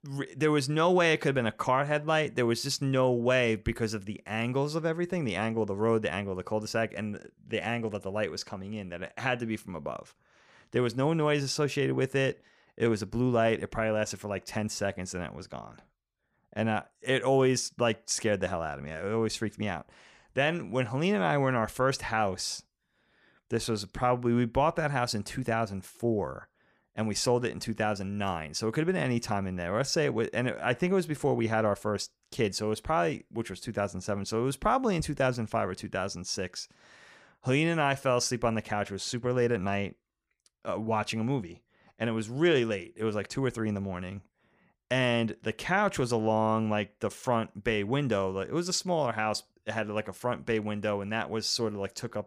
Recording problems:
none

